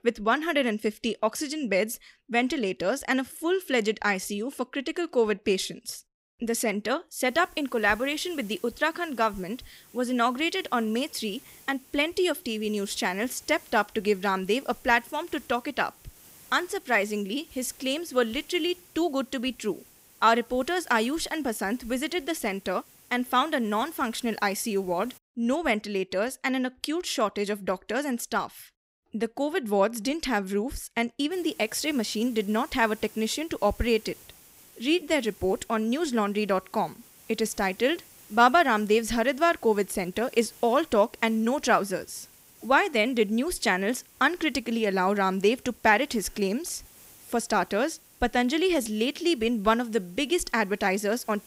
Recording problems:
hiss; faint; from 7.5 to 25 s and from 31 s on; 25 dB below the speech

